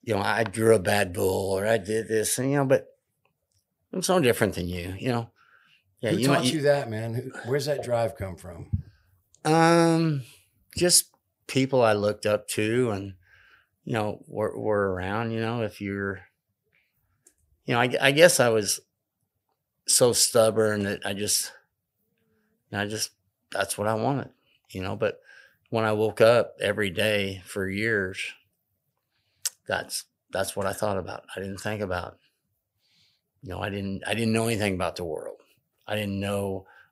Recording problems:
none

